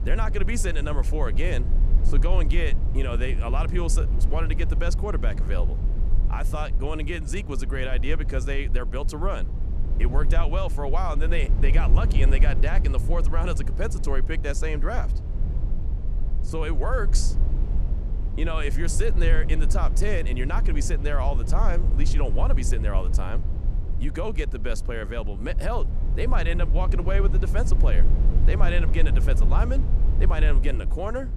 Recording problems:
low rumble; noticeable; throughout; 10 dB below the speech

